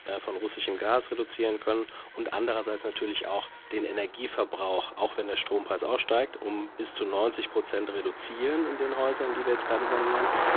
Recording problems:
phone-call audio; poor line
traffic noise; loud; throughout; 5 dB below the speech

